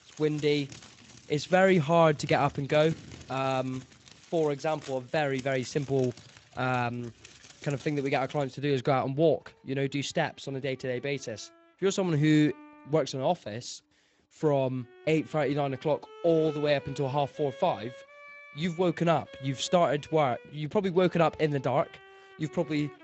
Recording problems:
garbled, watery; slightly; nothing above 7.5 kHz
high frequencies cut off; slight
household noises; faint; throughout; 20 dB below the speech
background music; faint; throughout; 20 dB below the speech

